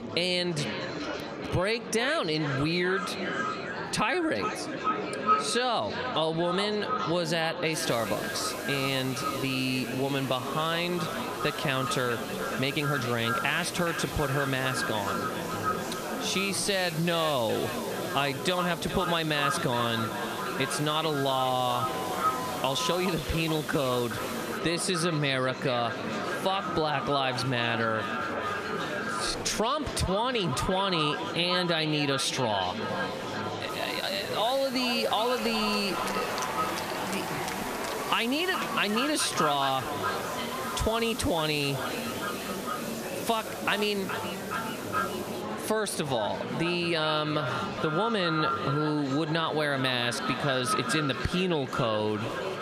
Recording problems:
echo of what is said; strong; throughout; 420 ms later, 6 dB below the speech
squashed, flat; heavily, background pumping
murmuring crowd; loud; throughout; 9 dB below the speech
hiss; noticeable; from 7.5 to 25 s and from 34 to 45 s; 15 dB below the speech
uneven, jittery; strongly; from 13 to 34 s

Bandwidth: 14.5 kHz